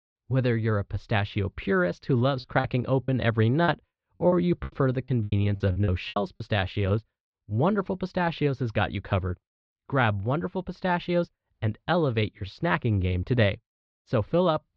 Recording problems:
muffled; very slightly; fading above 4 kHz
choppy; very; from 2.5 to 6.5 s; 17% of the speech affected

